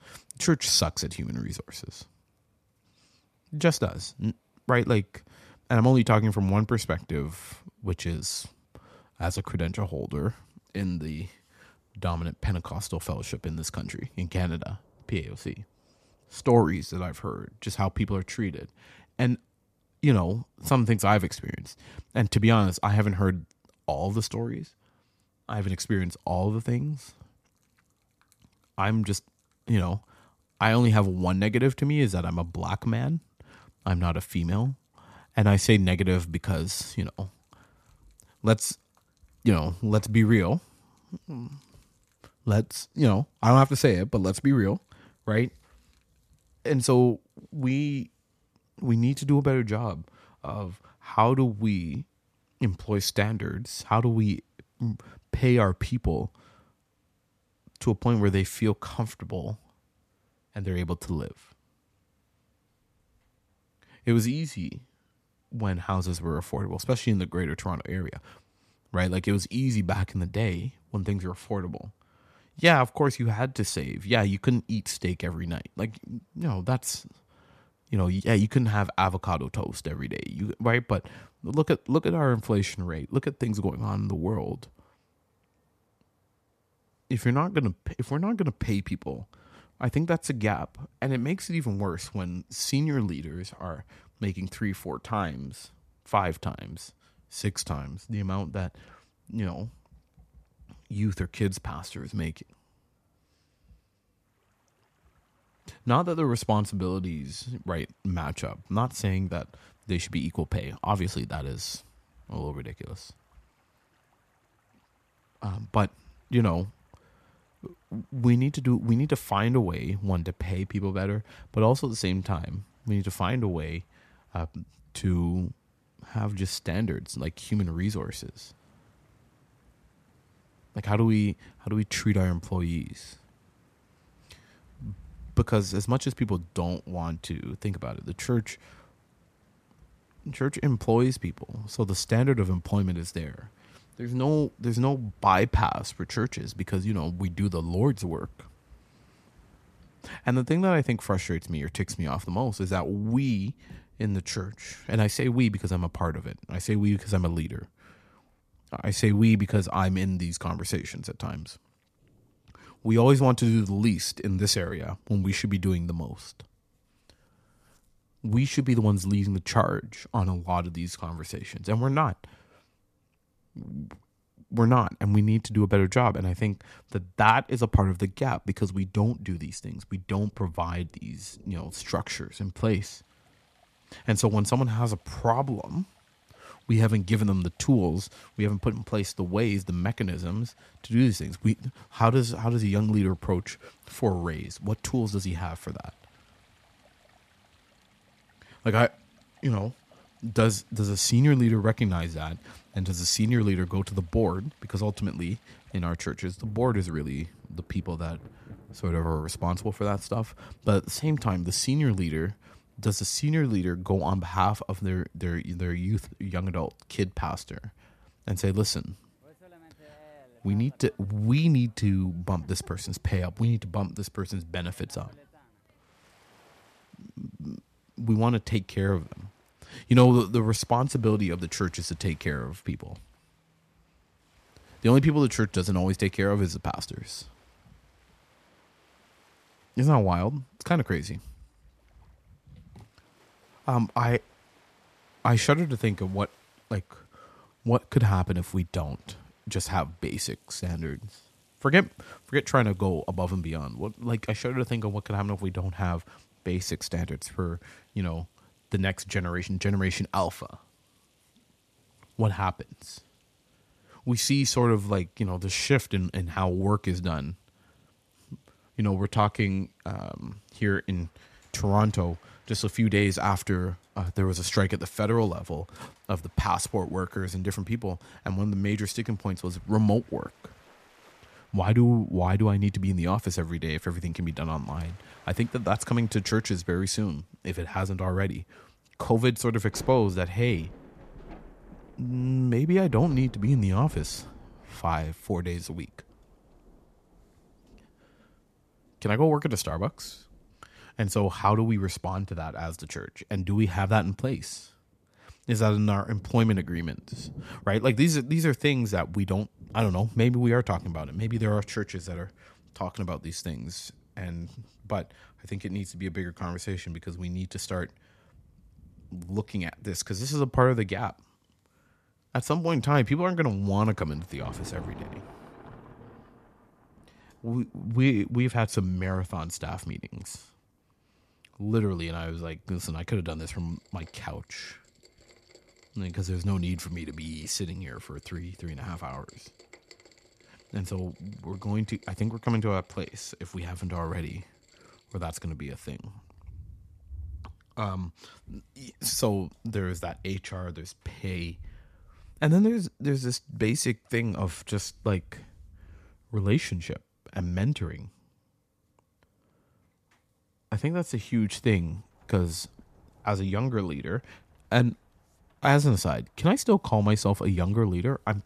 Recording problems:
rain or running water; faint; throughout; 30 dB below the speech

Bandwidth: 14.5 kHz